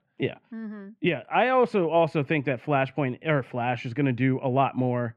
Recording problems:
muffled; very; fading above 1.5 kHz

